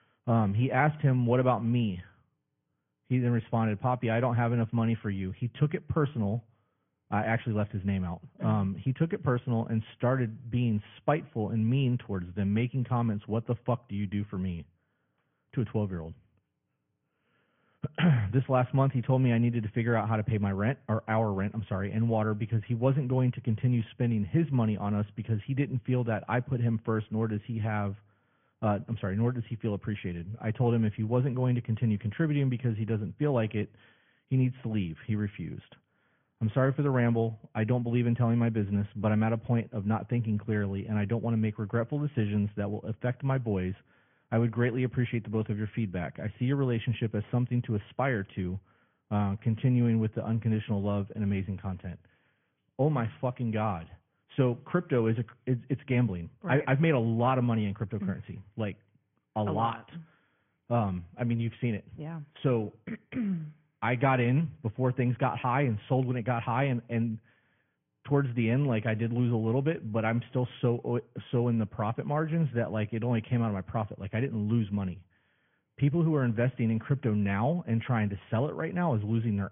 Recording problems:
high frequencies cut off; severe; nothing above 3.5 kHz
garbled, watery; slightly

